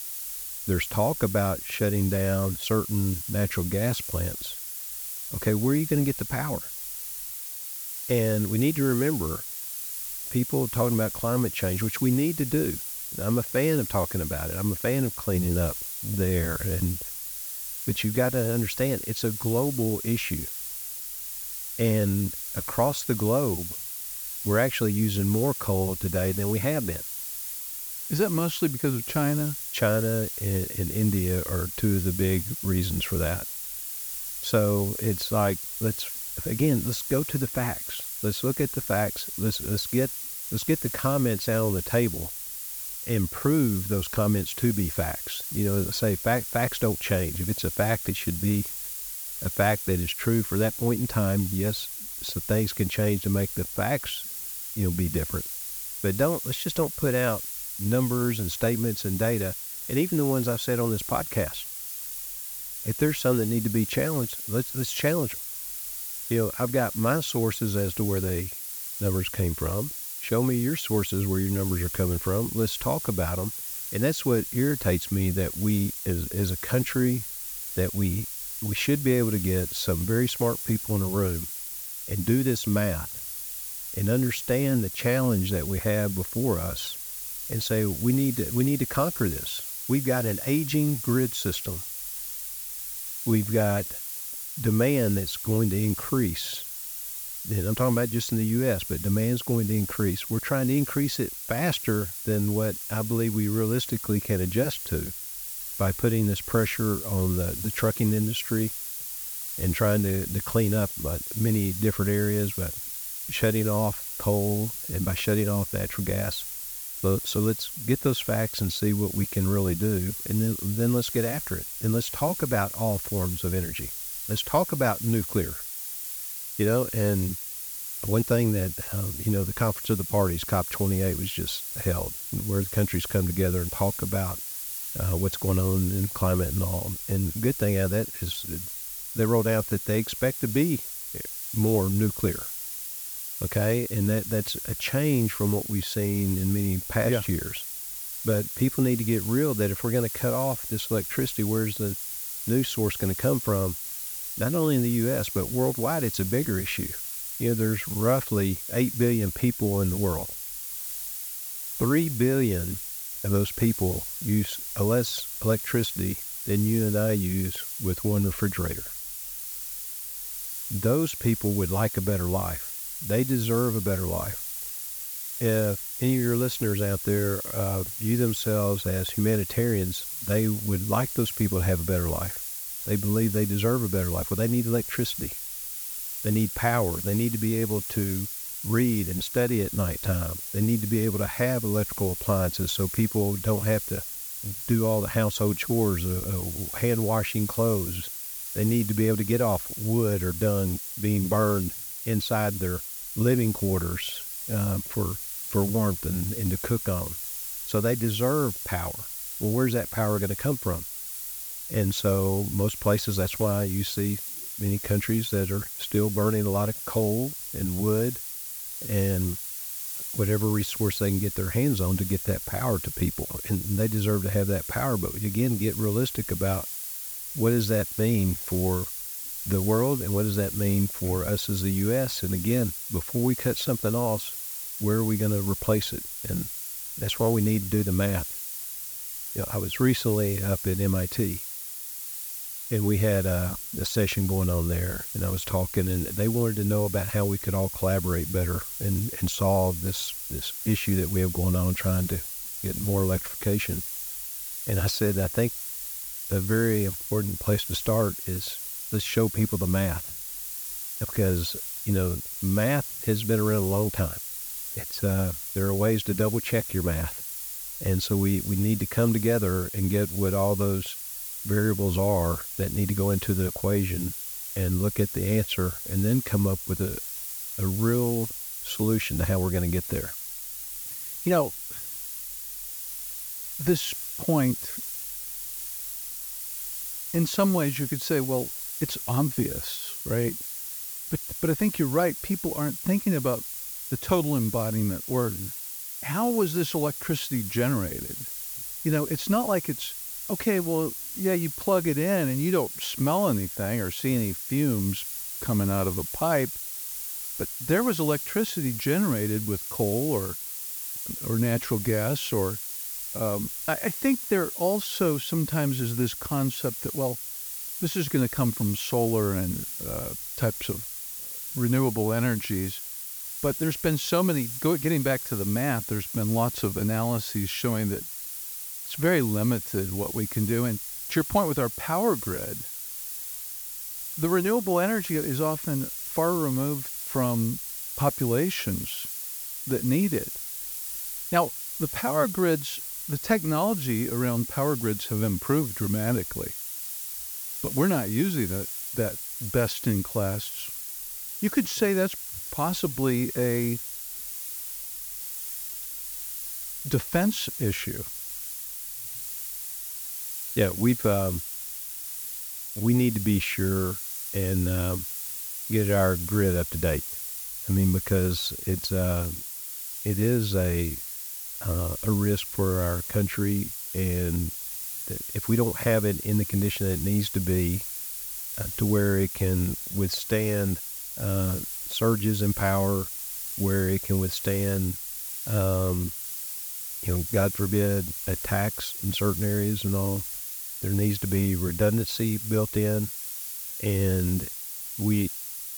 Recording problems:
hiss; loud; throughout; 5 dB below the speech

